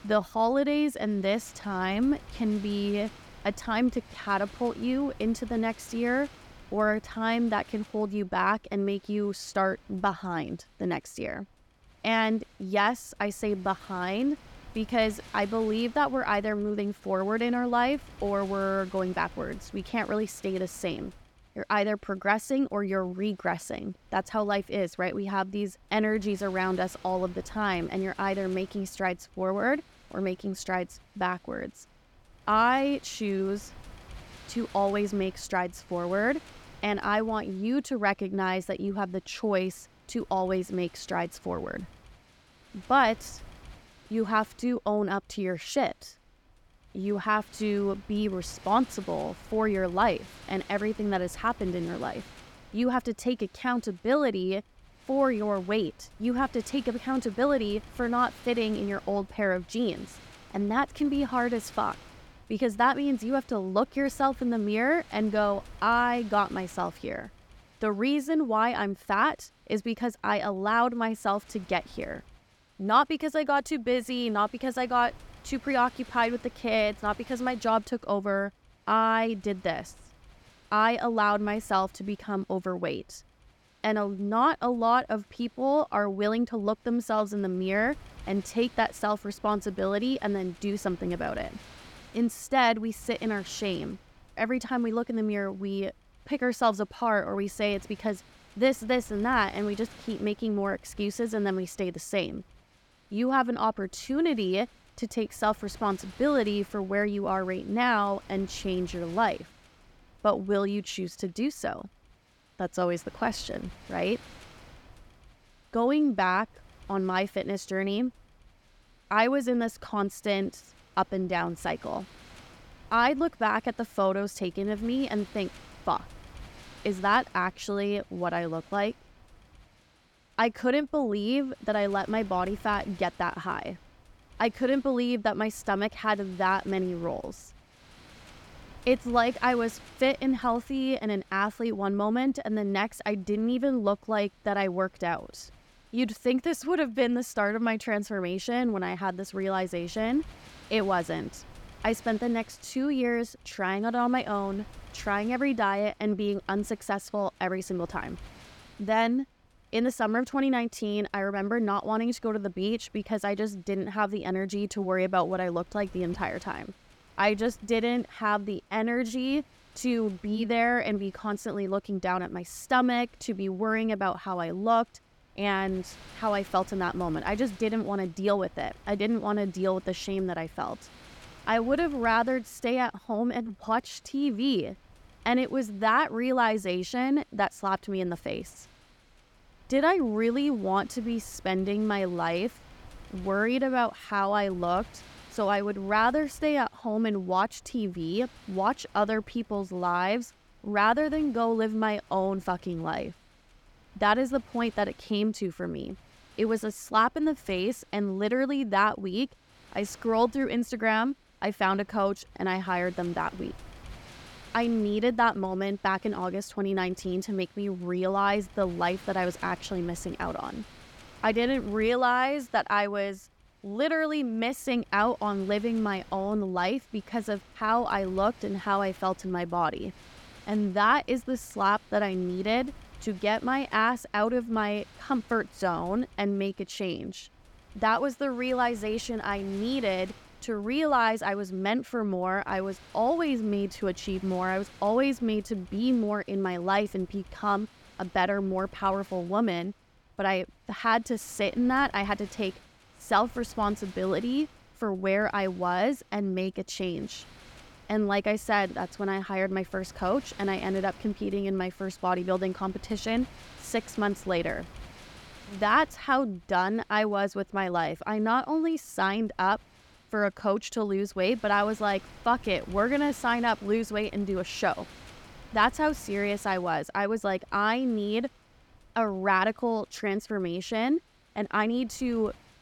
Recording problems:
wind noise on the microphone; occasional gusts; 25 dB below the speech

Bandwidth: 17.5 kHz